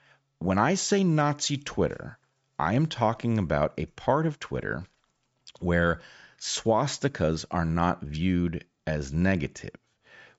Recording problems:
high frequencies cut off; noticeable; nothing above 8 kHz

